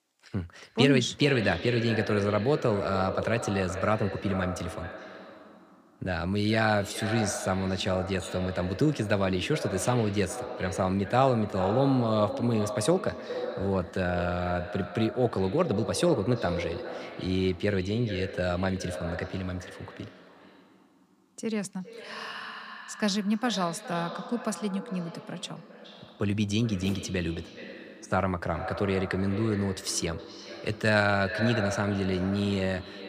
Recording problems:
echo of what is said; strong; throughout; 420 ms later, 9 dB below the speech

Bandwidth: 15 kHz